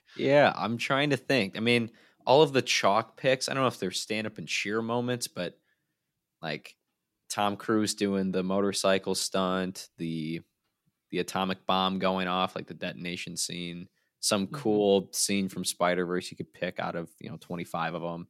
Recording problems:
none

